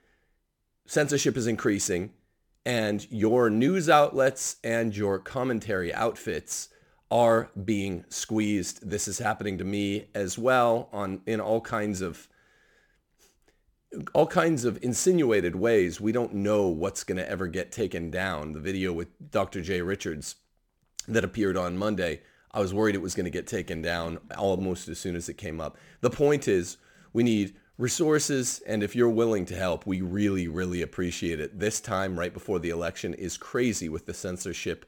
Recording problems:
none

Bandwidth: 18.5 kHz